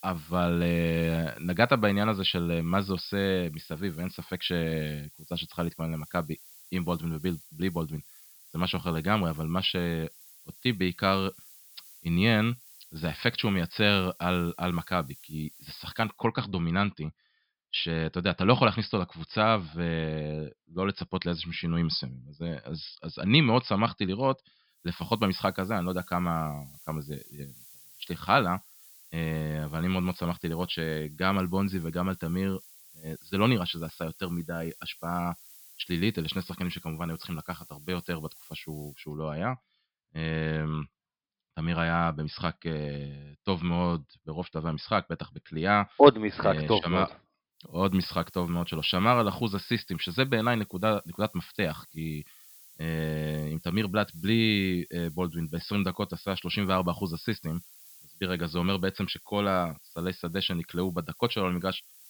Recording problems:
high frequencies cut off; noticeable; nothing above 5.5 kHz
hiss; faint; until 16 s, from 25 to 39 s and from 48 s on; 20 dB below the speech

